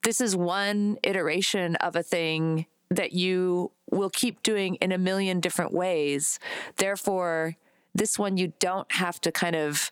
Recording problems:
squashed, flat; somewhat

